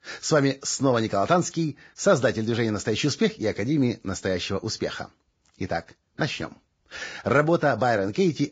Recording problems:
garbled, watery; badly; nothing above 7.5 kHz

